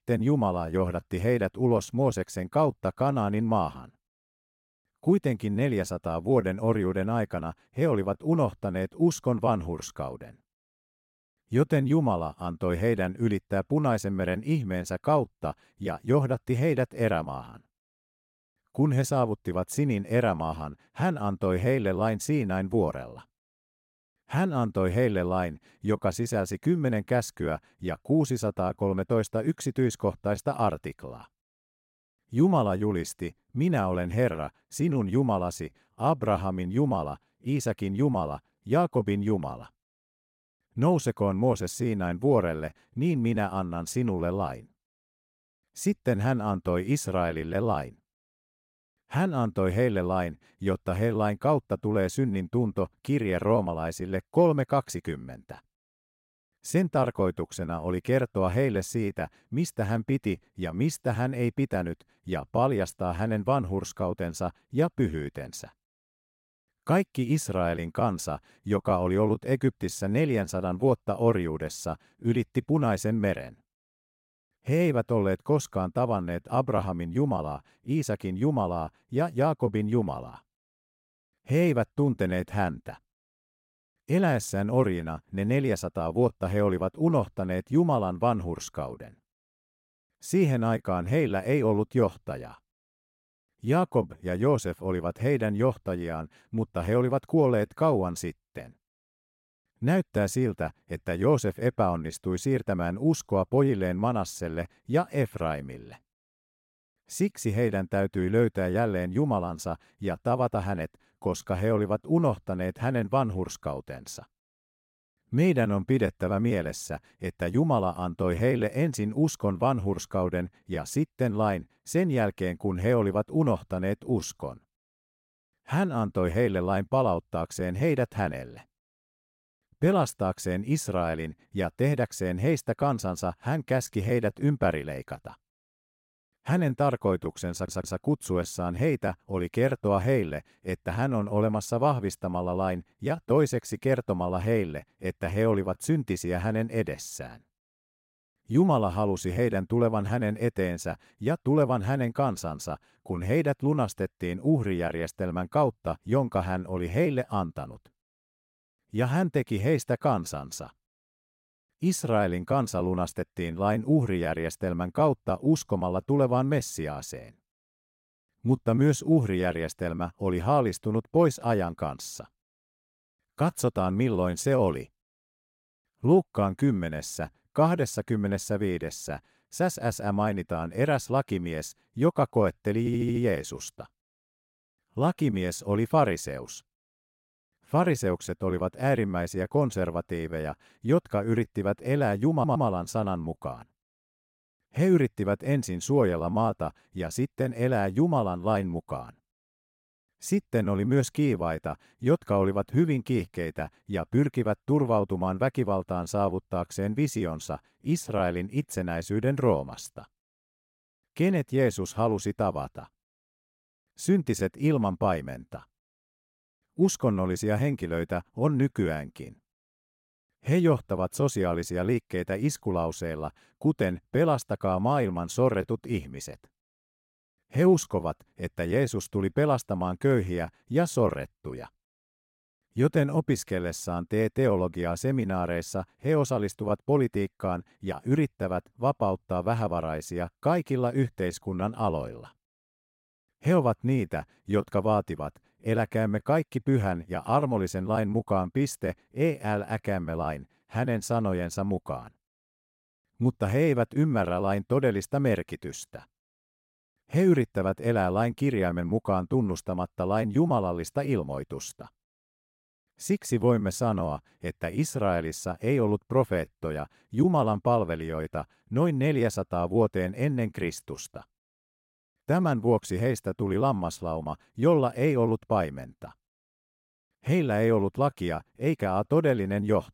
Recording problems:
audio stuttering; at 2:18, at 3:03 and at 3:12

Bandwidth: 16 kHz